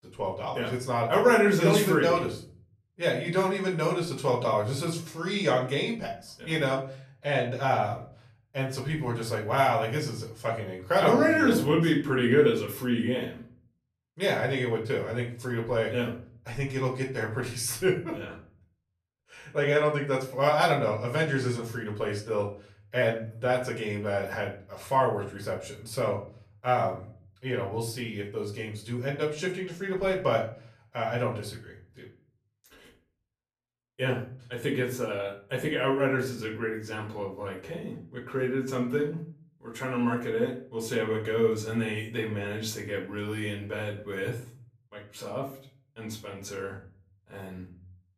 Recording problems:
off-mic speech; far
room echo; slight; dies away in 0.4 s

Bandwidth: 14.5 kHz